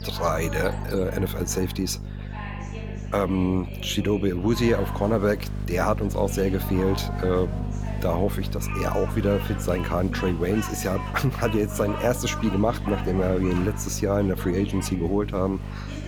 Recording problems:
electrical hum; noticeable; throughout; 50 Hz, 15 dB below the speech
animal sounds; noticeable; throughout; 15 dB below the speech
chatter from many people; noticeable; throughout; 15 dB below the speech

